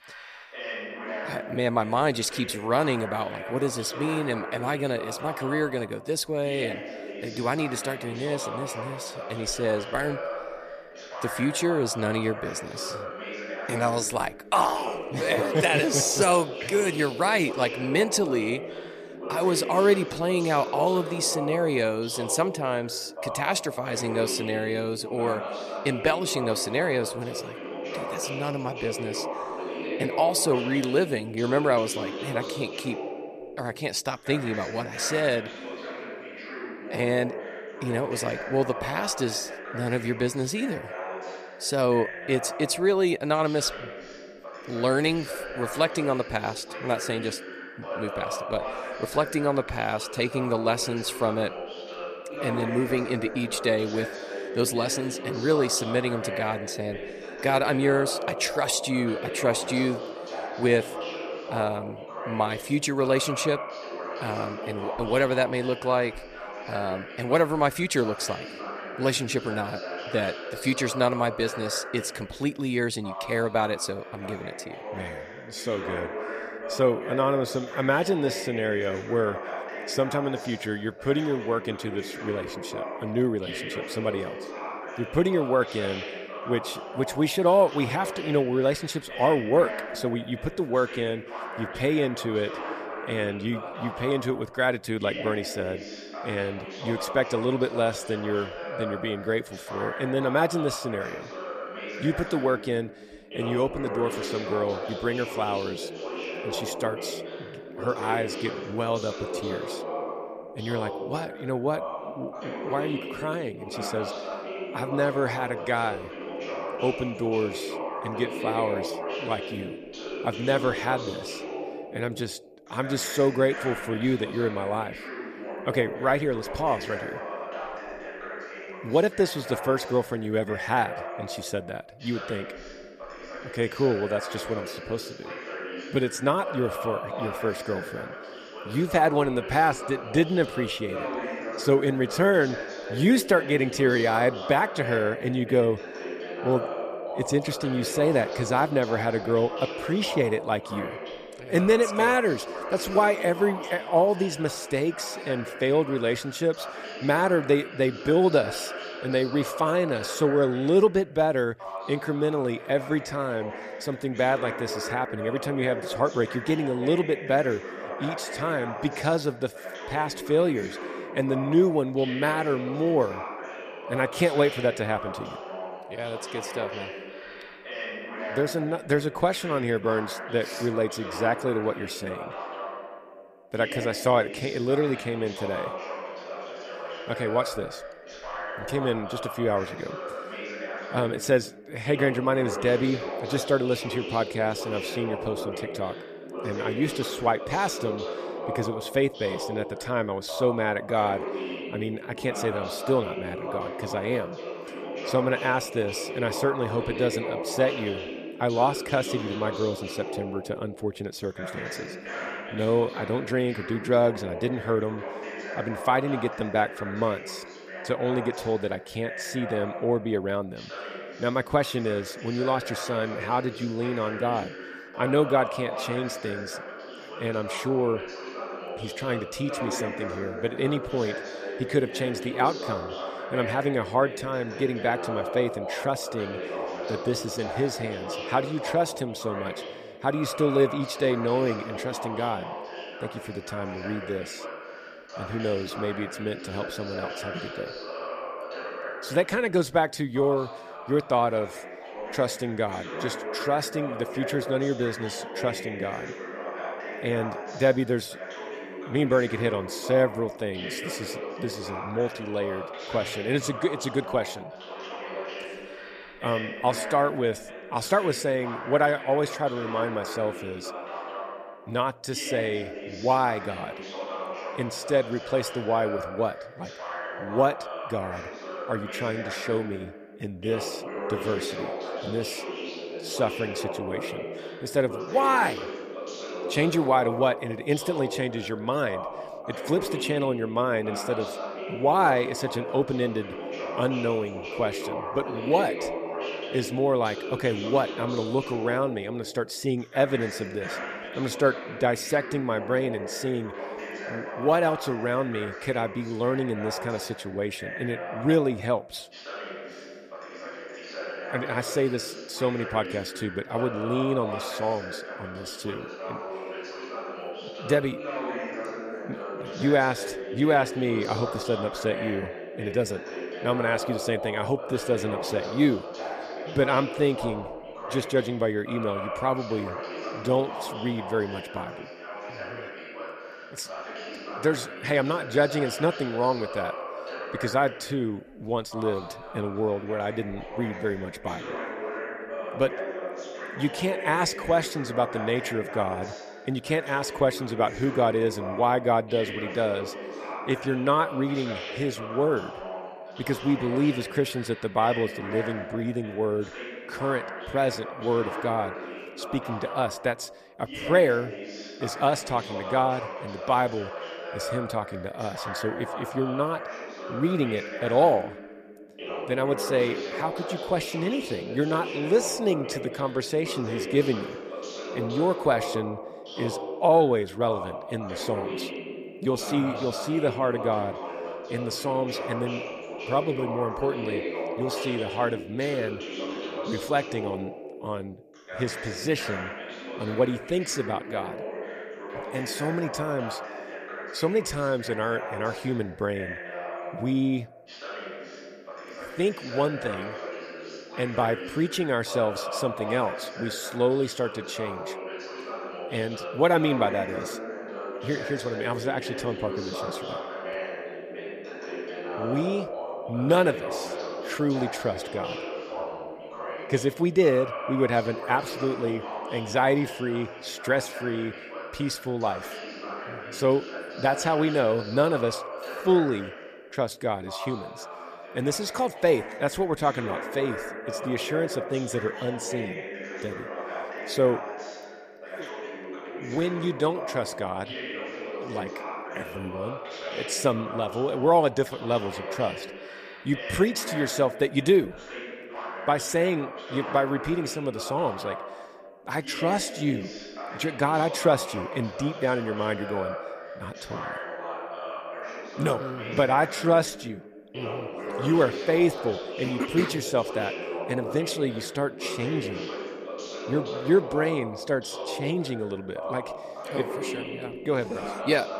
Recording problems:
voice in the background; loud; throughout; 8 dB below the speech

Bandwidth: 14.5 kHz